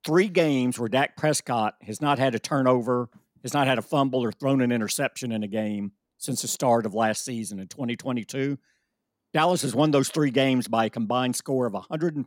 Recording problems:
none

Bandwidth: 16.5 kHz